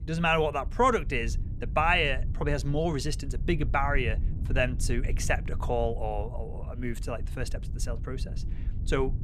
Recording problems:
low rumble; faint; throughout; 20 dB below the speech

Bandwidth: 14.5 kHz